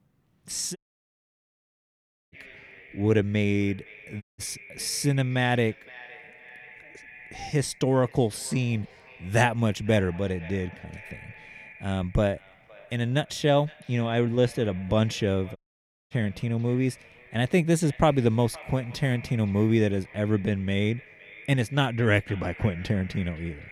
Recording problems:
echo of what is said; faint; throughout; 510 ms later, 20 dB below the speech
audio cutting out; at 1 s for 1.5 s, at 4 s and at 16 s for 0.5 s

